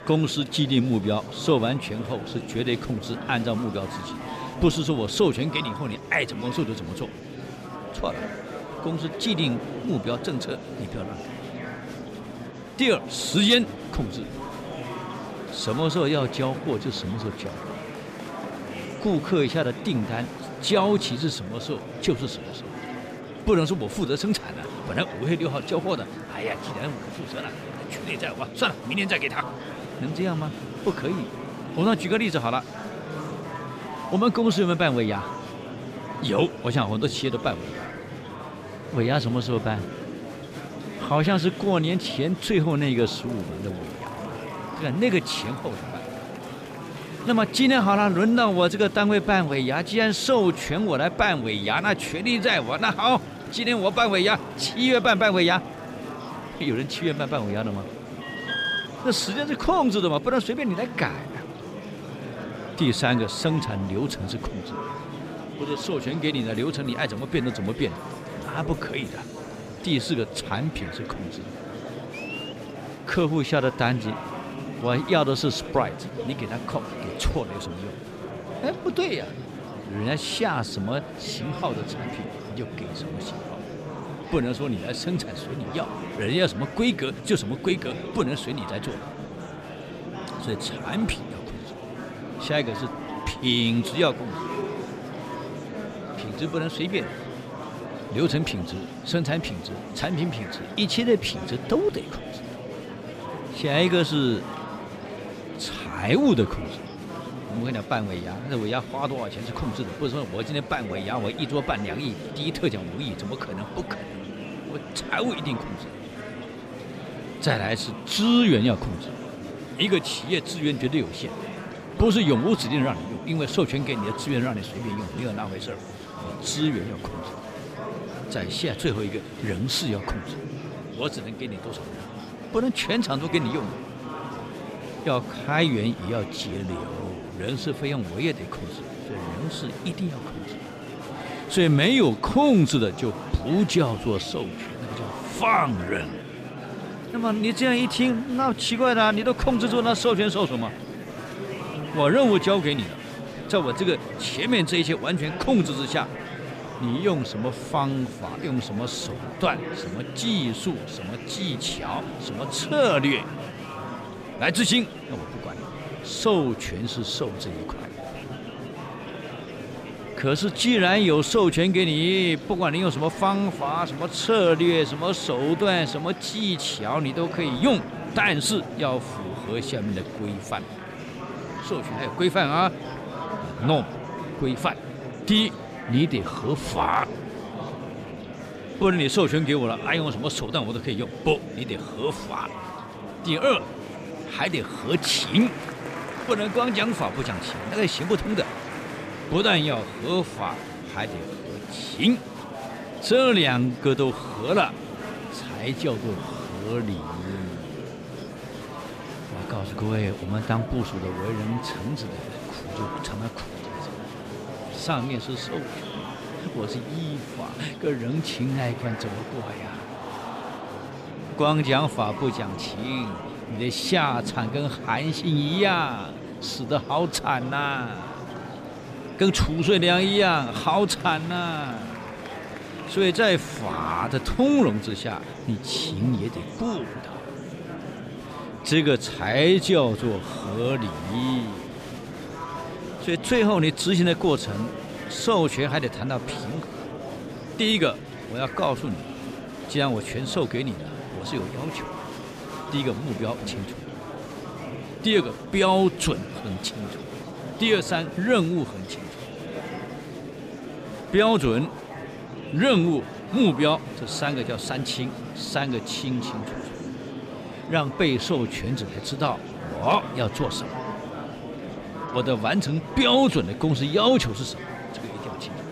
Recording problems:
murmuring crowd; noticeable; throughout; 10 dB below the speech
alarm; noticeable; at 58 s; peak level with the speech

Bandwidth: 14.5 kHz